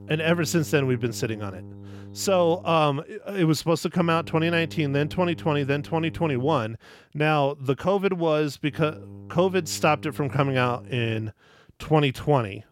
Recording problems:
electrical hum; faint; until 3 s, from 4 to 6.5 s and from 8.5 to 11 s; 50 Hz, 25 dB below the speech

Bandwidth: 16.5 kHz